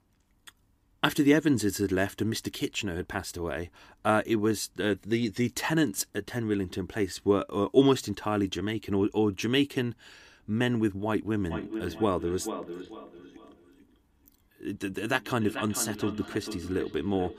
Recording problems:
echo of what is said; strong; from 11 s on; 440 ms later, 10 dB below the speech

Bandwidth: 15 kHz